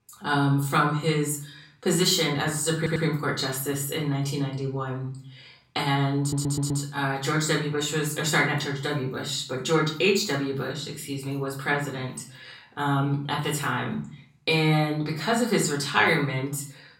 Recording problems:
off-mic speech; far
room echo; slight; dies away in 0.4 s
audio stuttering; at 3 s and at 6 s

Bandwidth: 16 kHz